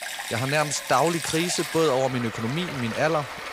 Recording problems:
rain or running water; loud; throughout; 7 dB below the speech

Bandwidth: 15.5 kHz